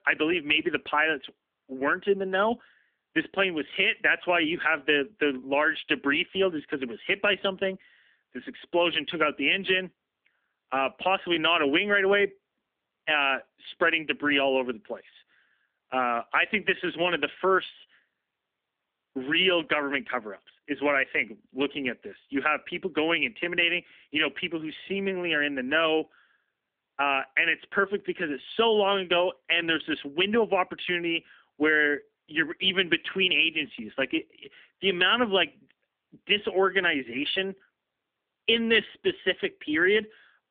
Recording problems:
phone-call audio; nothing above 3 kHz

